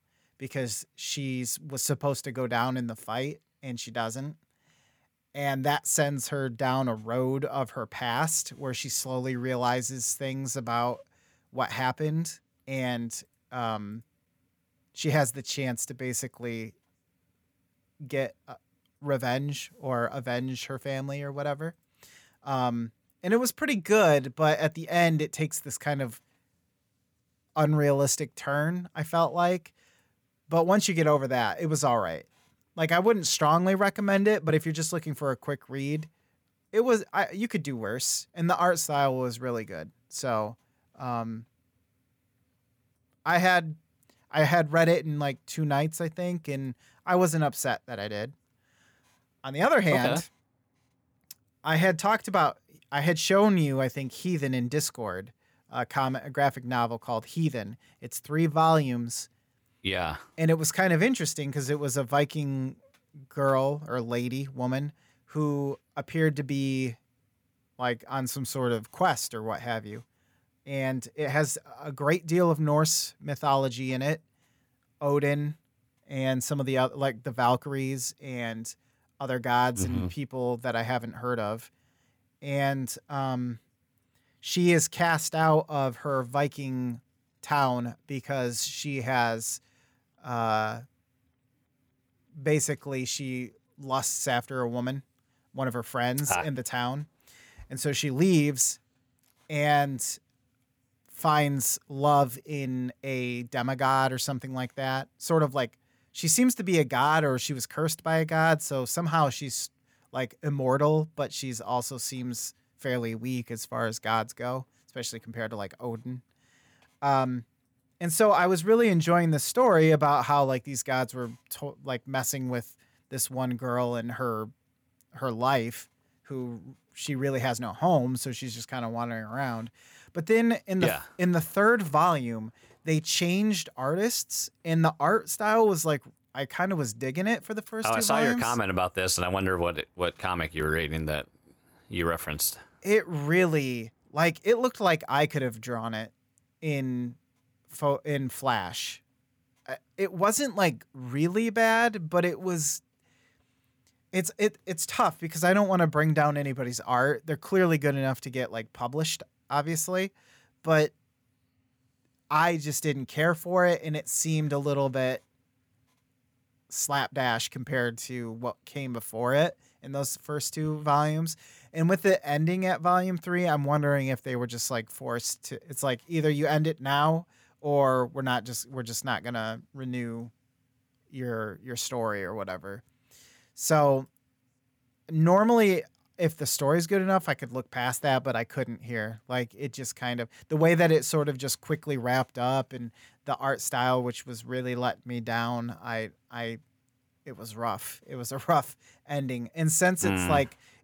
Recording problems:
none

